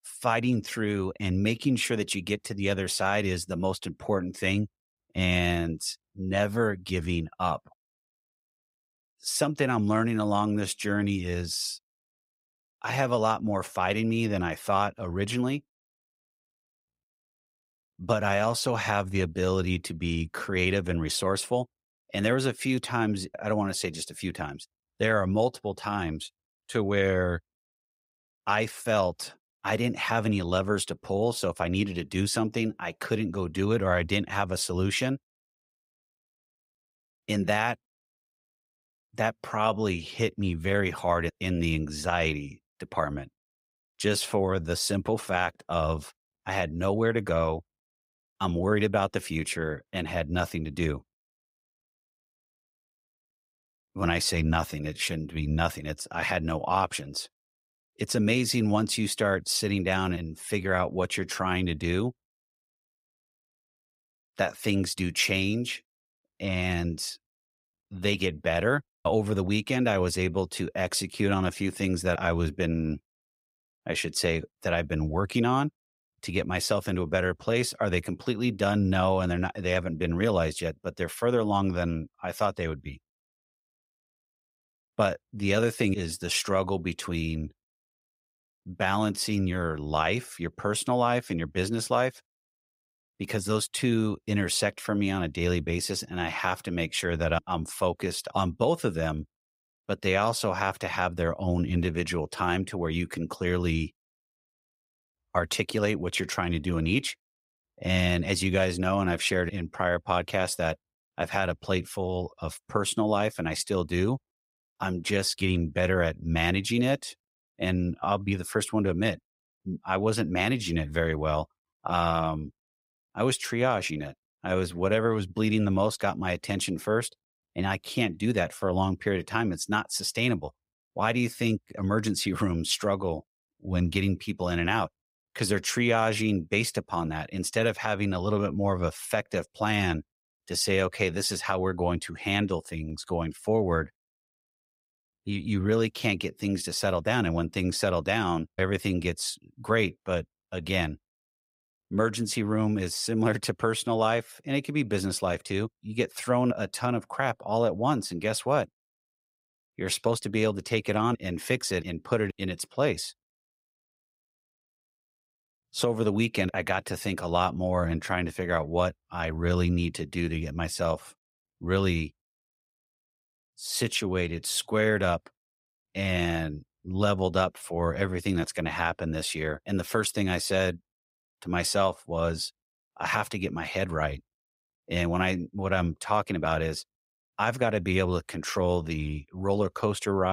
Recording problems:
abrupt cut into speech; at the end

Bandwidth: 15.5 kHz